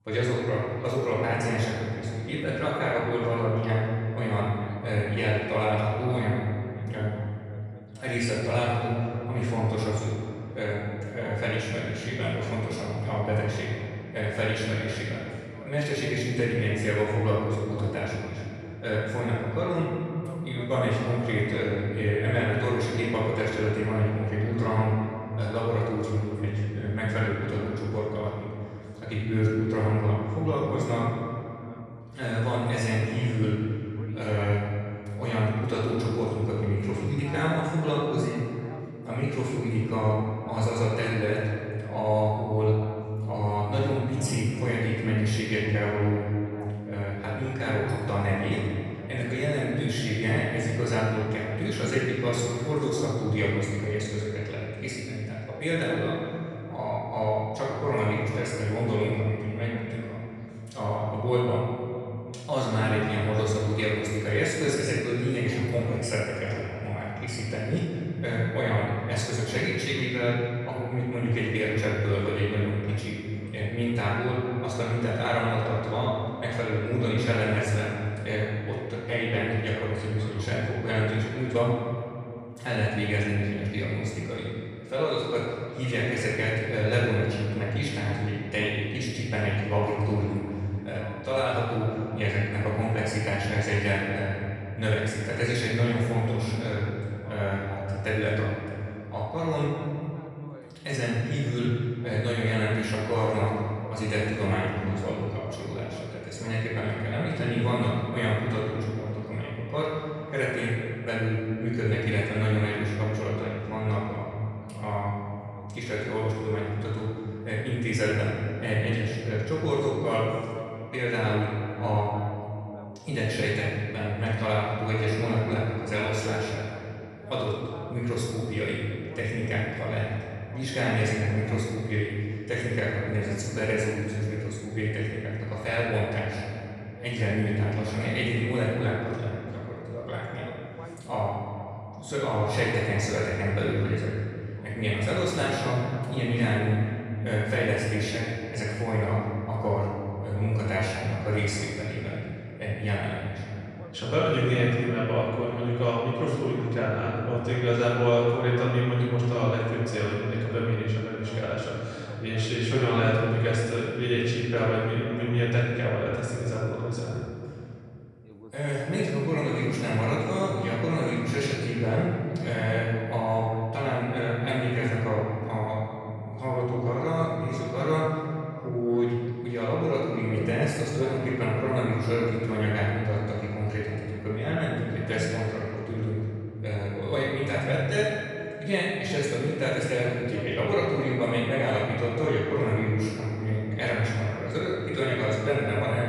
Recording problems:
room echo; strong; dies away in 2.4 s
off-mic speech; far
voice in the background; faint; throughout; 20 dB below the speech

